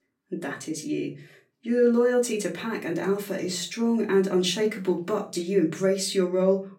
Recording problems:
off-mic speech; far
room echo; very slight; dies away in 0.3 s

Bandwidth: 16 kHz